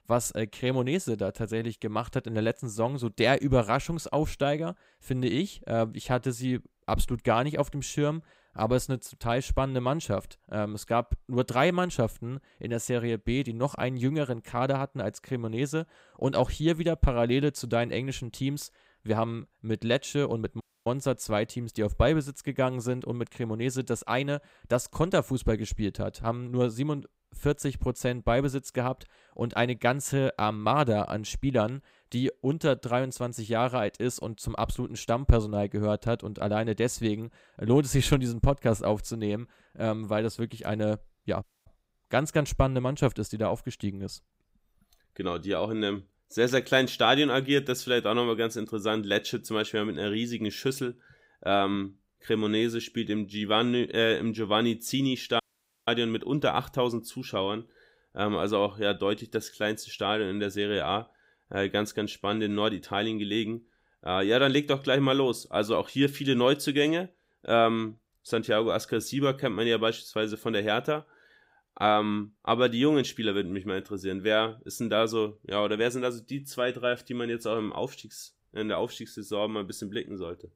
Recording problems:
audio cutting out; at 21 s, at 41 s and at 55 s

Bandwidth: 15.5 kHz